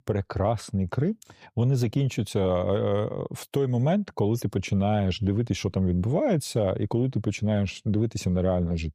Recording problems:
none

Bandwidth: 15 kHz